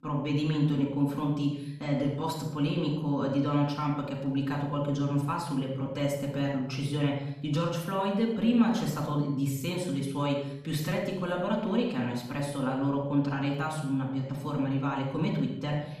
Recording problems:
off-mic speech; far
room echo; noticeable; dies away in 0.7 s

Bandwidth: 14.5 kHz